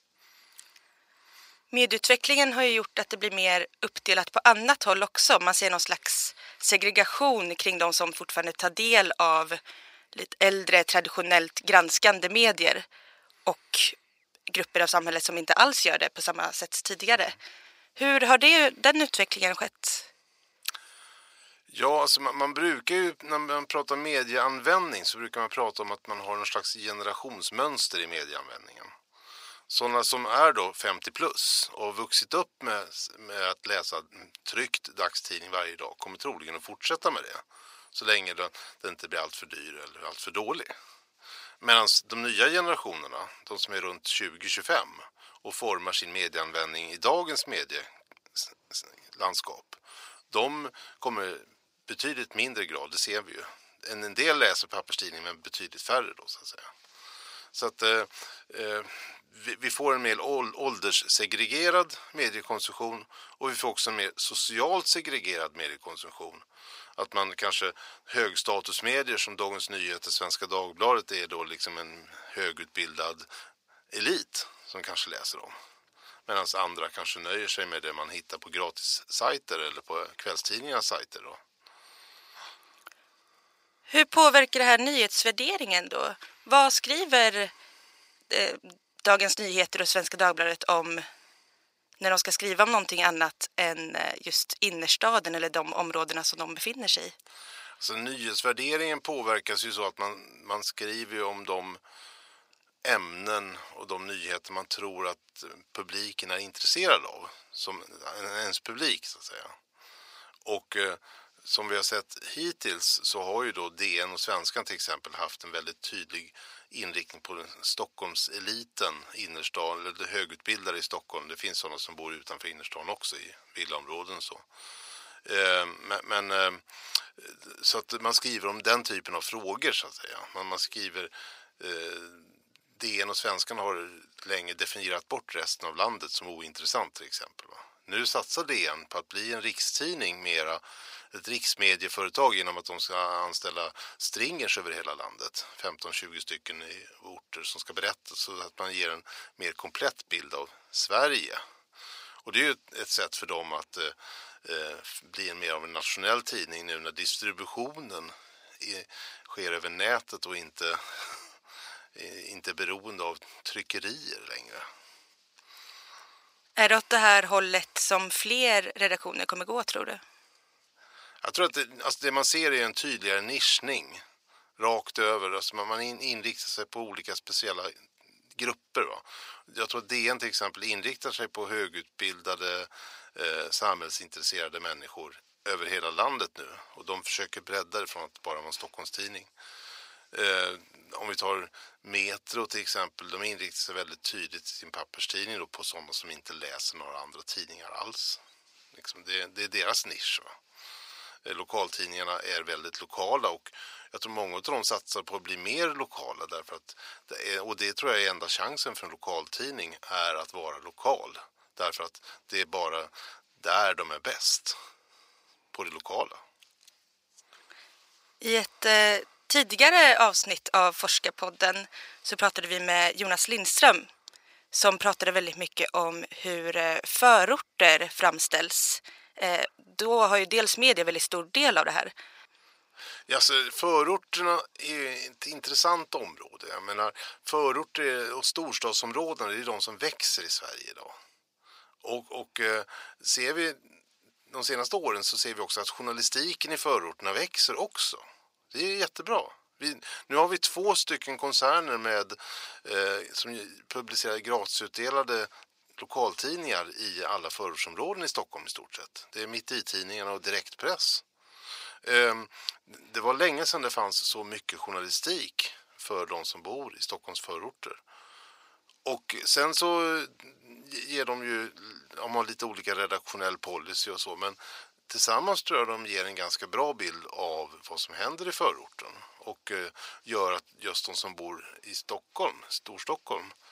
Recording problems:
thin; very; fading below 900 Hz

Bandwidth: 15.5 kHz